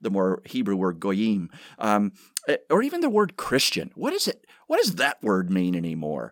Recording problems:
none

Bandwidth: 17 kHz